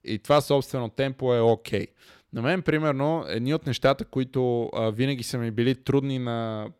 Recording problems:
none

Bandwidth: 16.5 kHz